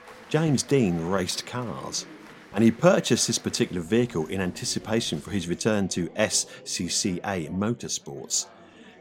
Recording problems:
chatter from many people; faint; throughout; 20 dB below the speech

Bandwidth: 16 kHz